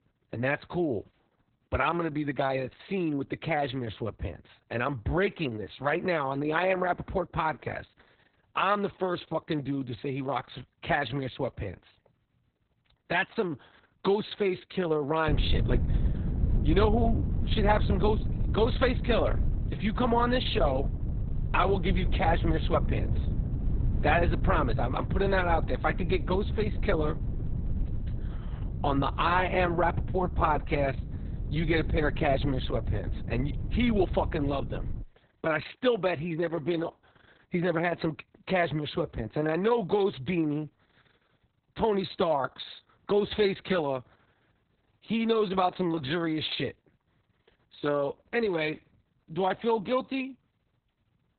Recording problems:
garbled, watery; badly; nothing above 4 kHz
wind noise on the microphone; occasional gusts; from 15 to 35 s; 15 dB below the speech

